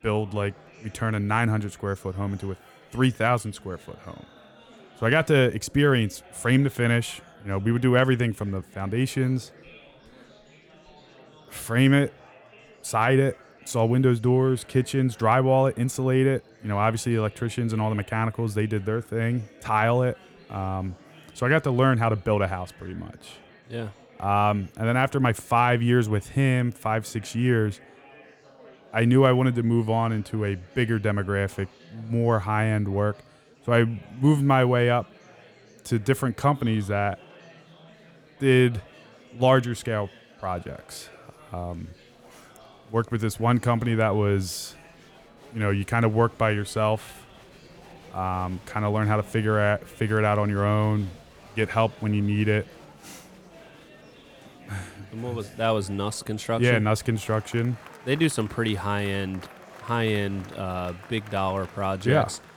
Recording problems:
chatter from many people; faint; throughout; 25 dB below the speech

